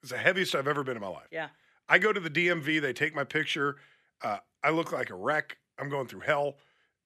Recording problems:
thin; somewhat; fading below 600 Hz

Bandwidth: 14 kHz